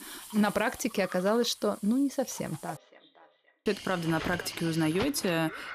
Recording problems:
echo of what is said; faint; from 2.5 s on; 520 ms later, 20 dB below the speech
household noises; noticeable; throughout; 15 dB below the speech
animal sounds; noticeable; from 3.5 s on; 15 dB below the speech
hiss; noticeable; throughout; 20 dB below the speech
audio cutting out; at 3 s for 1 s

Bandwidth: 15 kHz